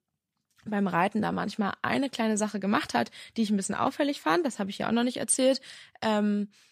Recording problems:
none

